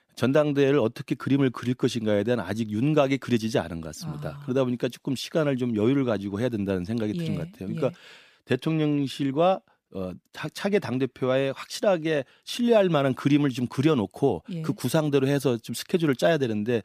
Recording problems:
none

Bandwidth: 15 kHz